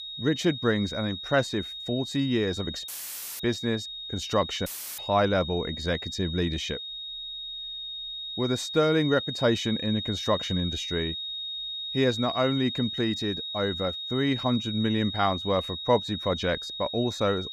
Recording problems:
high-pitched whine; loud; throughout; 3.5 kHz, 6 dB below the speech
audio cutting out; filled with static; at 3 s for 0.5 s and at 4.5 s

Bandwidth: 15 kHz